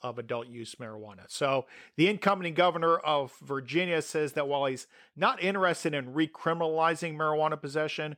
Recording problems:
none

